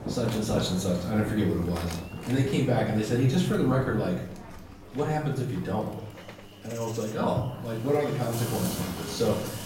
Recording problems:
off-mic speech; far
room echo; noticeable; dies away in 0.7 s
animal sounds; noticeable; throughout; 15 dB below the speech
rain or running water; noticeable; throughout; 10 dB below the speech
electrical hum; faint; throughout; 50 Hz, 20 dB below the speech
murmuring crowd; faint; throughout; 25 dB below the speech

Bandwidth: 16 kHz